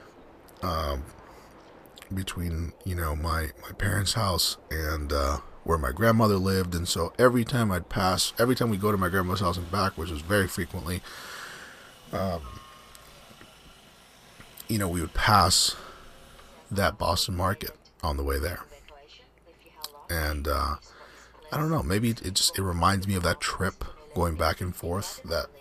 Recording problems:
train or aircraft noise; faint; throughout; 25 dB below the speech

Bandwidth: 14.5 kHz